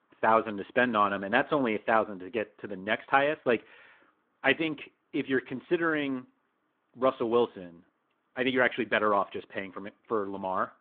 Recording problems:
phone-call audio

